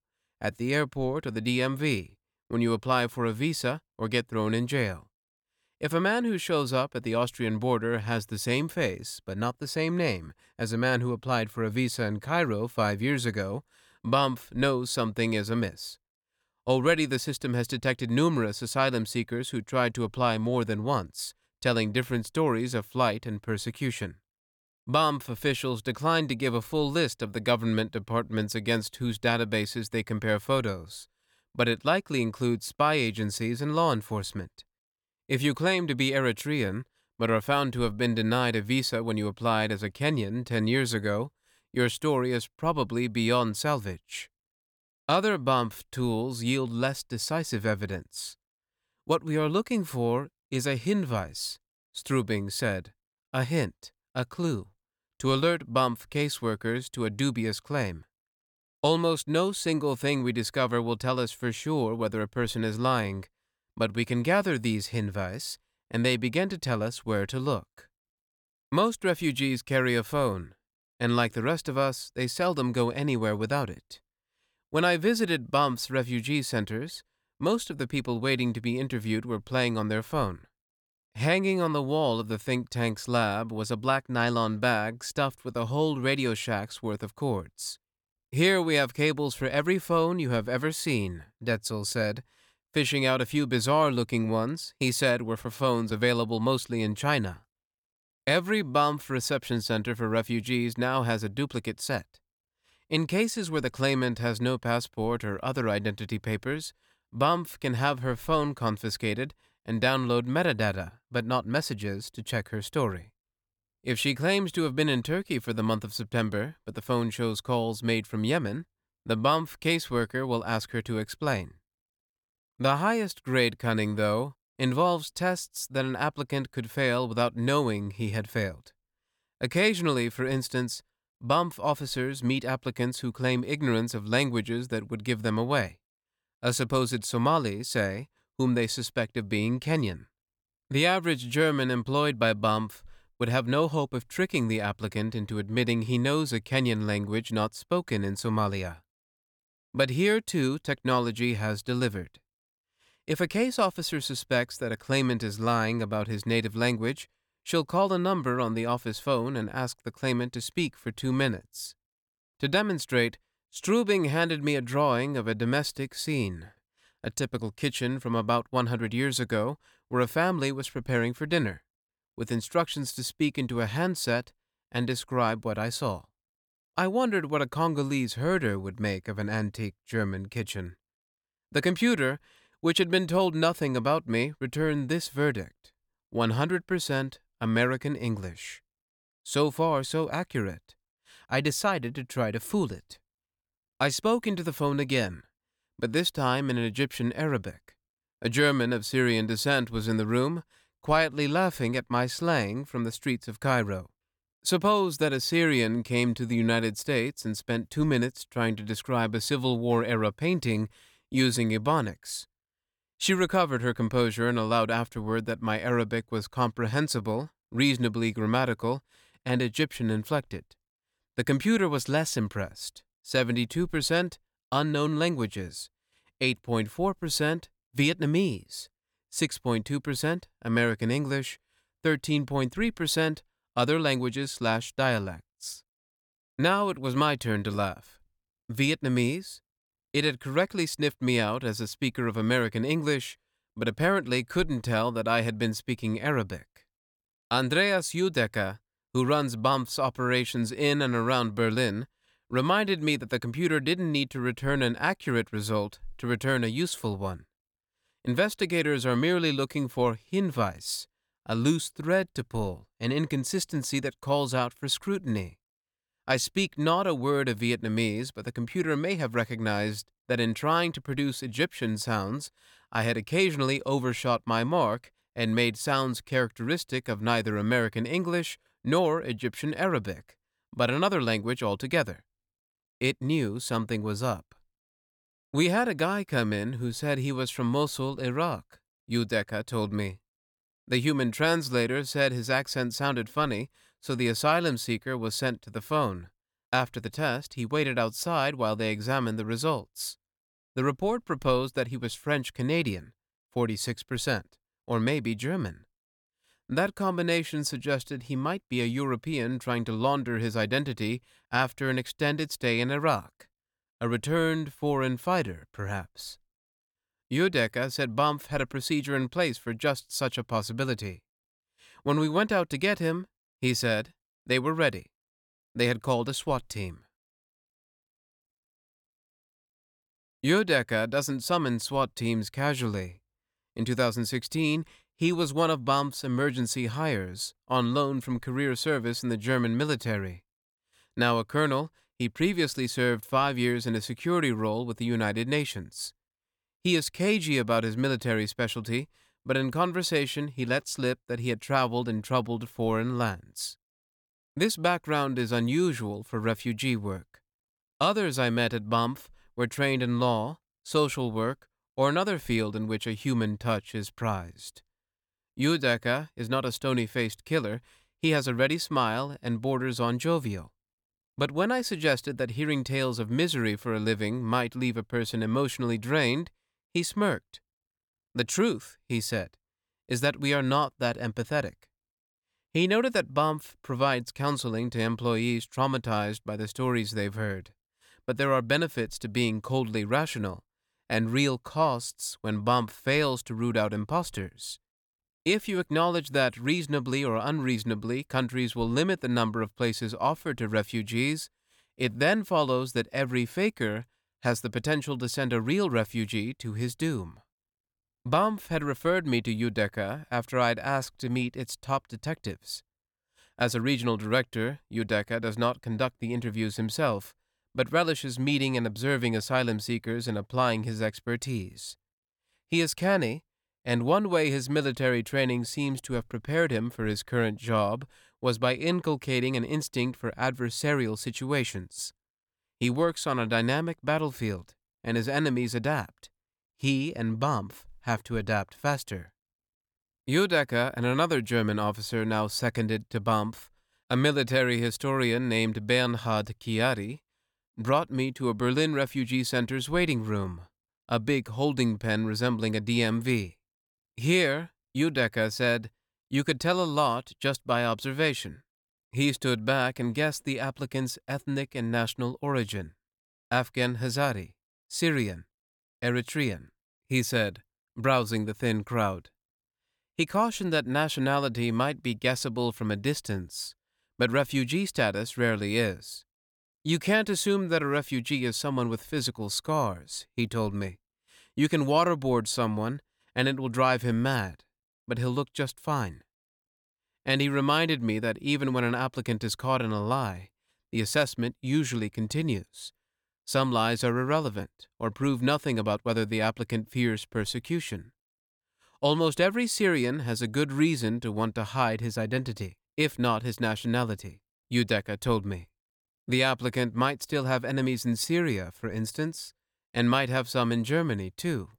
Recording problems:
none

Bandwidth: 18 kHz